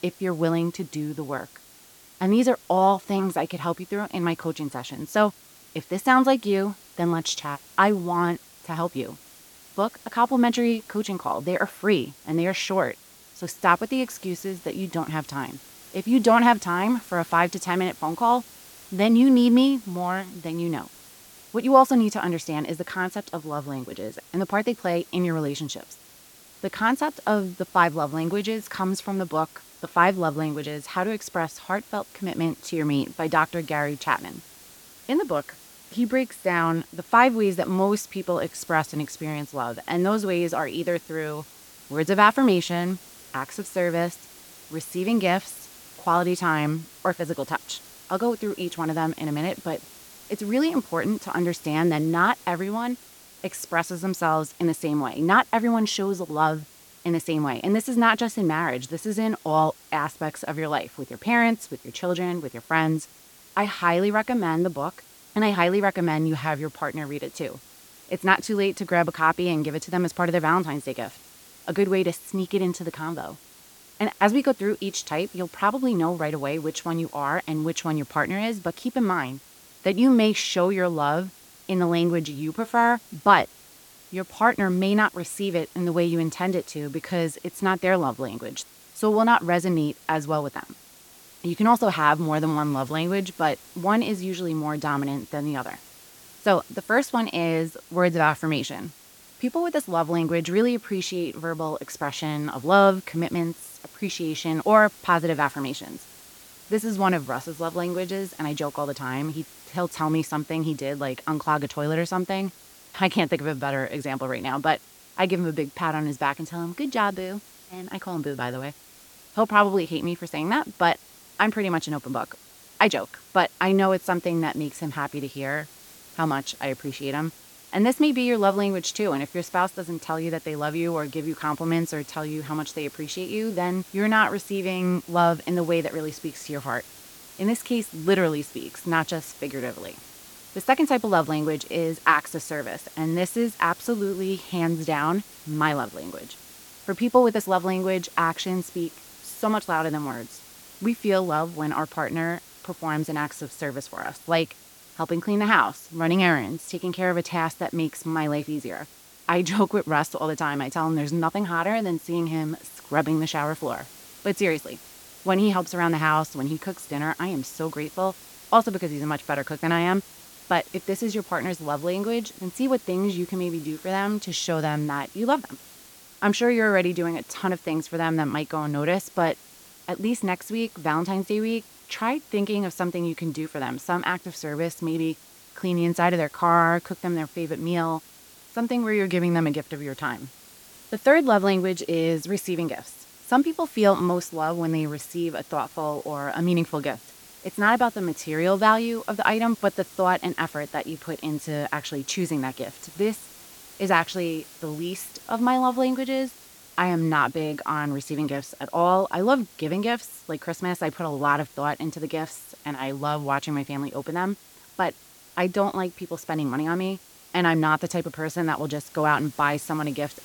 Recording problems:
hiss; faint; throughout; 20 dB below the speech

